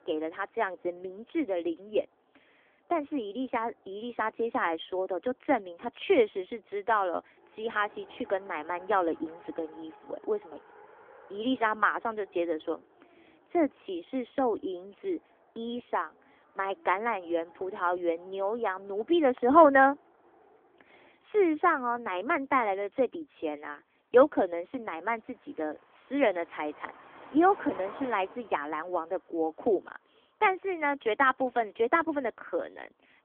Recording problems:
phone-call audio; nothing above 3.5 kHz
traffic noise; faint; throughout; 25 dB below the speech

